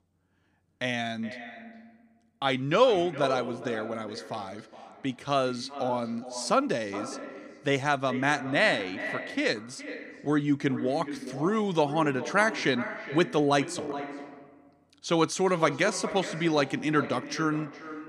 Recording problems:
echo of what is said; strong; throughout; 420 ms later, 10 dB below the speech

